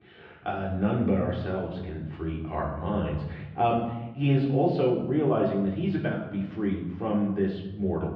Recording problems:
off-mic speech; far
muffled; very; fading above 3 kHz
room echo; noticeable; dies away in 0.9 s

